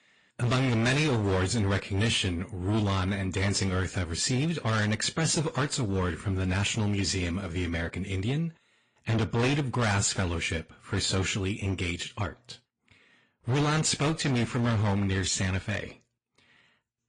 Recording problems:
distortion; heavy; 16% of the sound clipped
garbled, watery; slightly; nothing above 9 kHz

